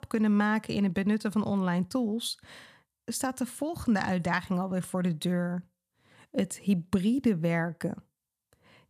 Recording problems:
none

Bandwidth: 14.5 kHz